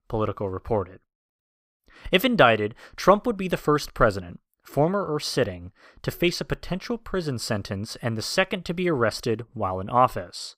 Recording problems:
none

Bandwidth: 15 kHz